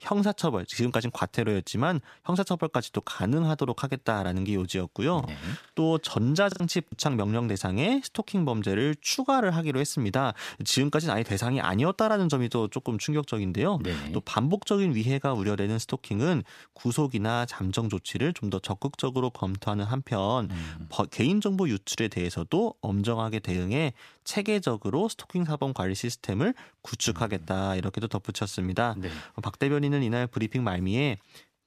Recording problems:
choppy; very; from 5 to 7 s; 6% of the speech affected

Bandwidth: 14.5 kHz